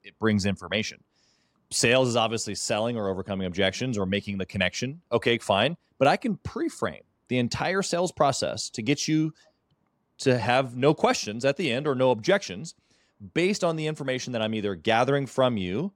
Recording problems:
none

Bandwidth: 16.5 kHz